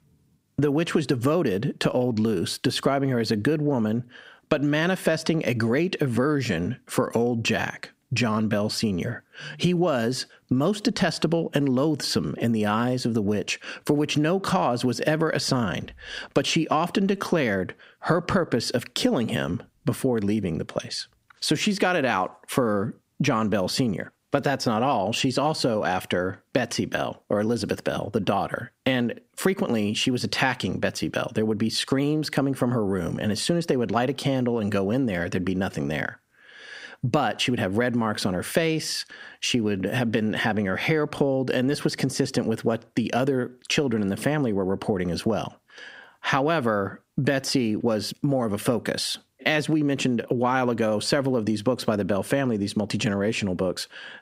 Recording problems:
squashed, flat; heavily

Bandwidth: 15.5 kHz